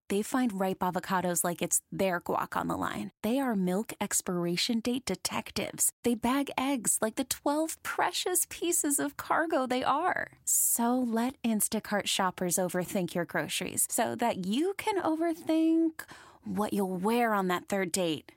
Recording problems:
none

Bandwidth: 16 kHz